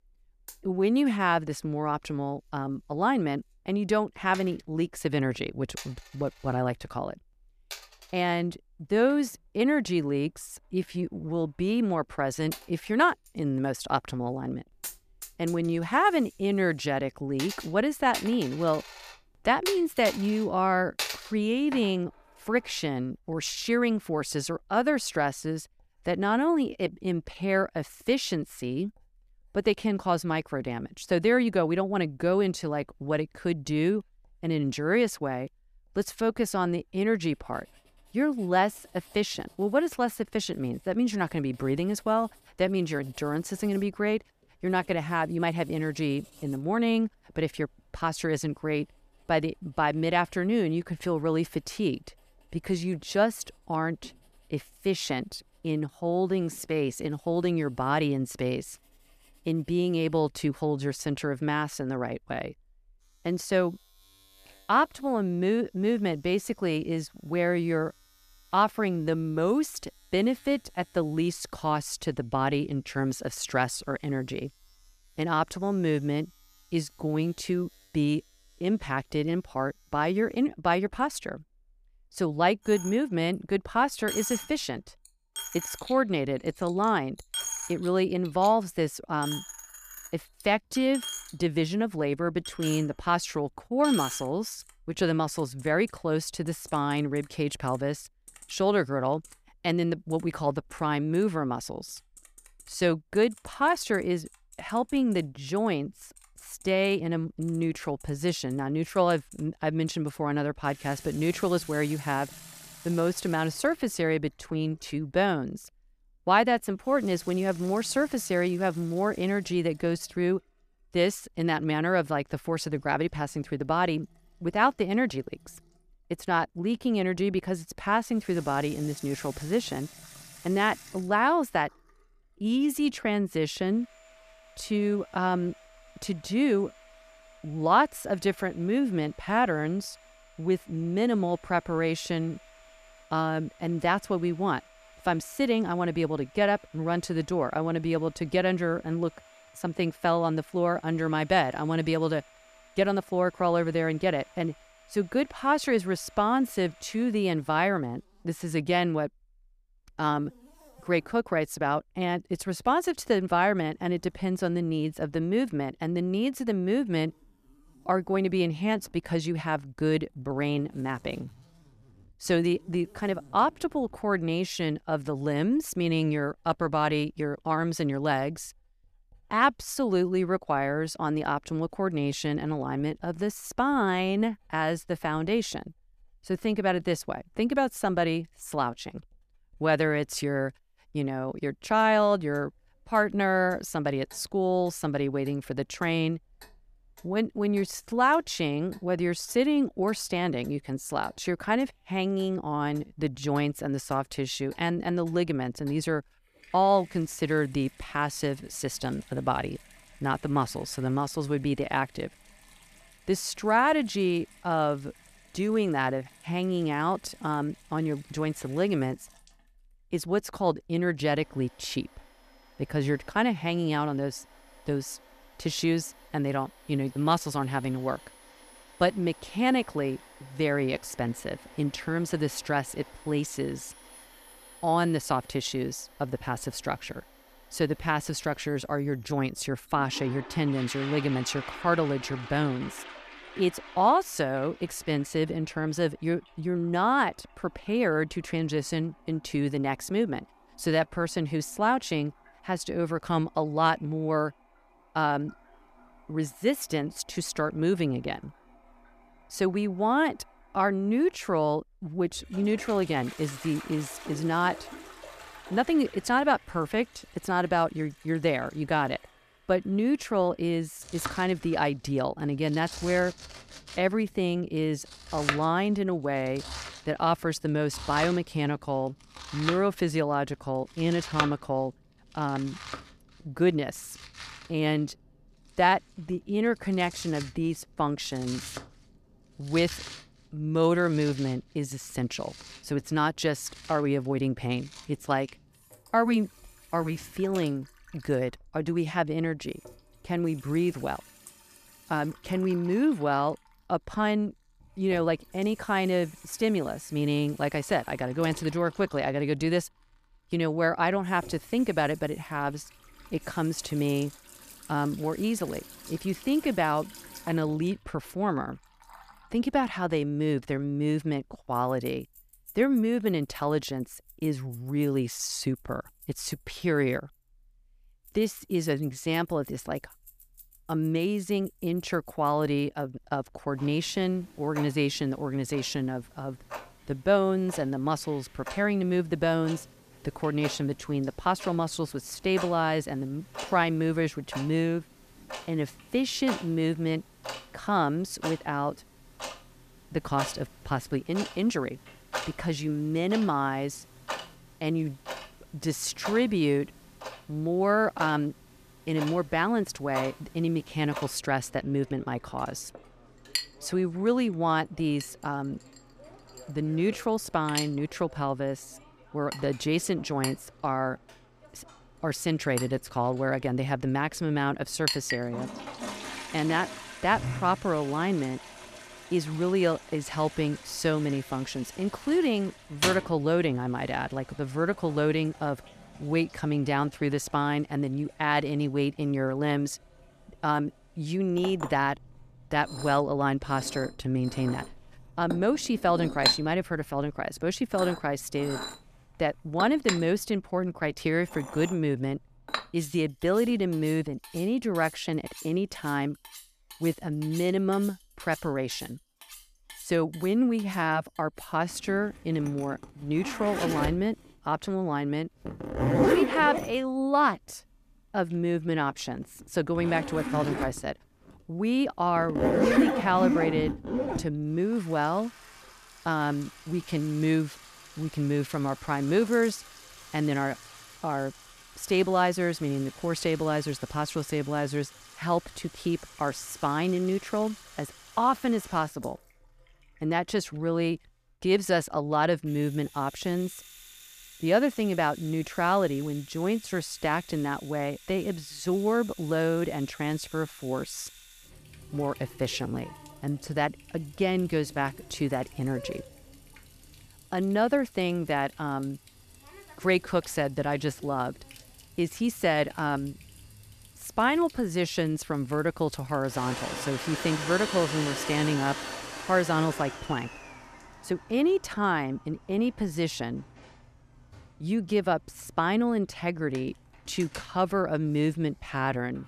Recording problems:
household noises; noticeable; throughout; 10 dB below the speech

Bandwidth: 14.5 kHz